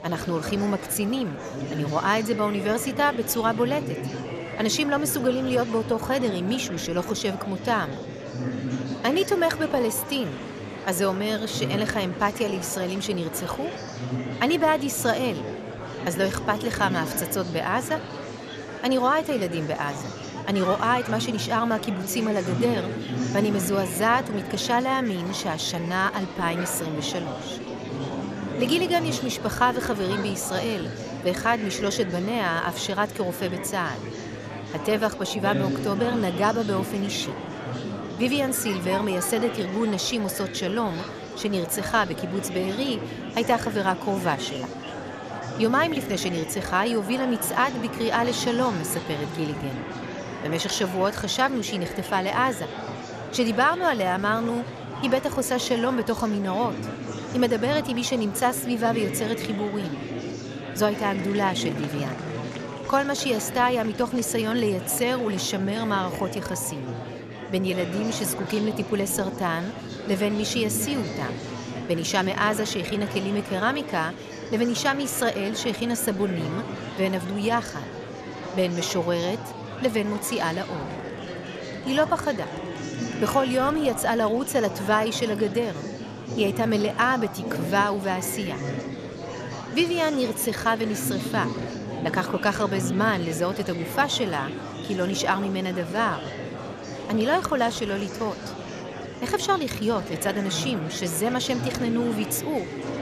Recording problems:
murmuring crowd; loud; throughout; 8 dB below the speech

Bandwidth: 14 kHz